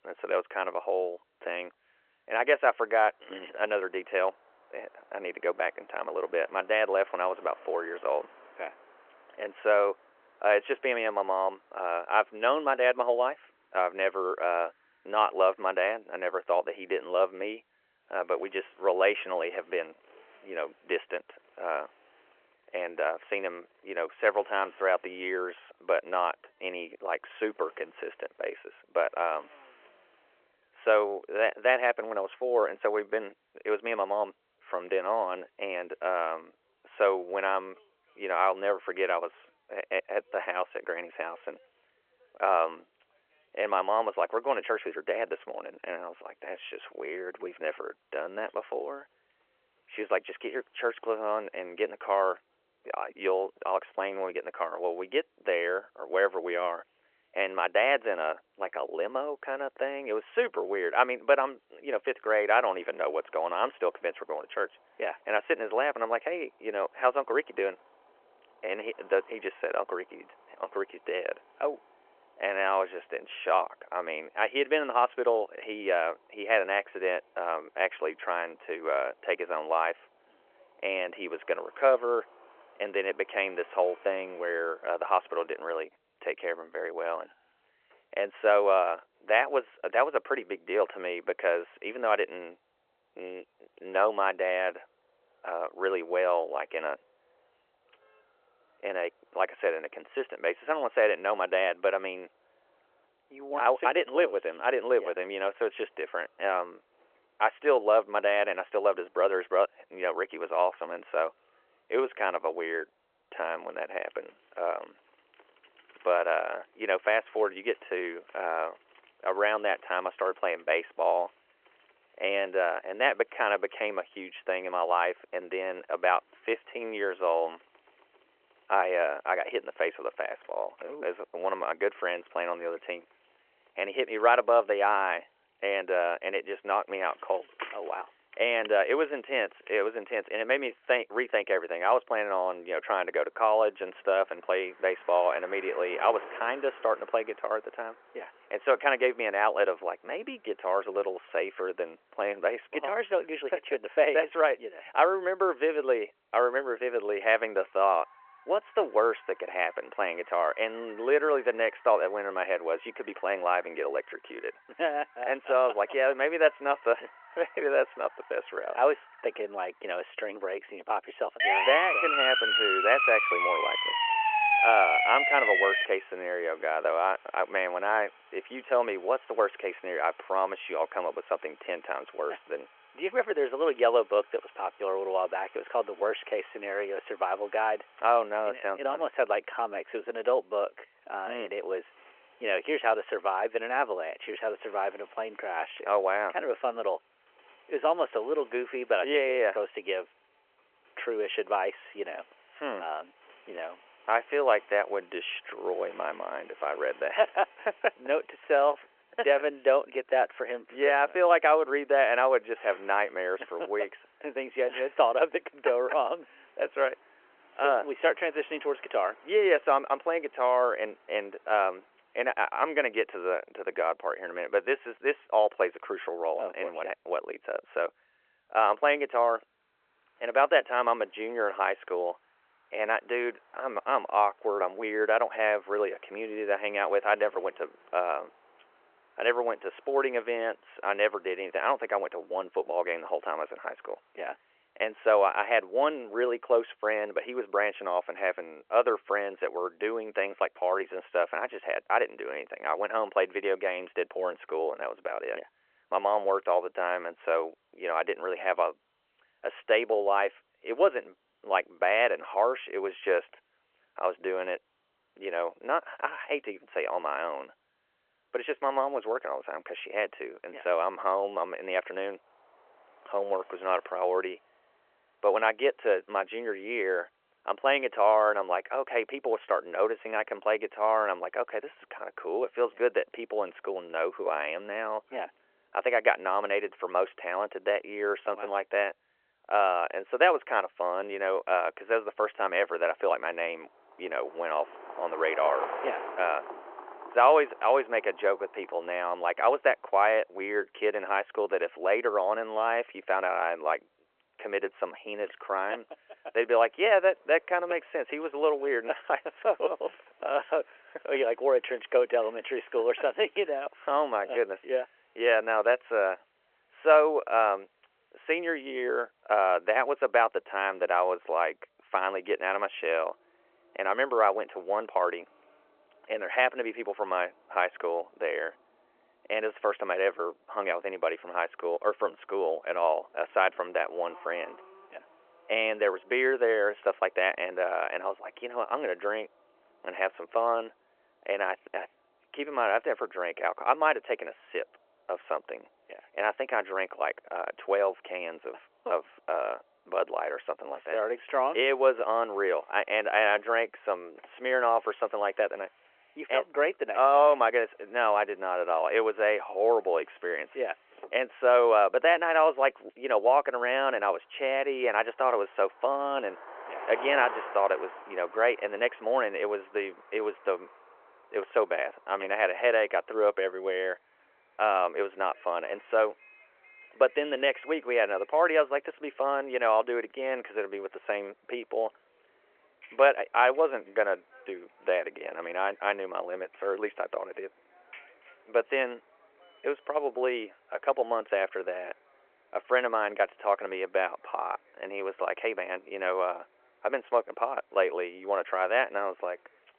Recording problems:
phone-call audio
traffic noise; faint; throughout; 25 dB below the speech
siren; loud; from 2:51 to 2:56; peak 7 dB above the speech

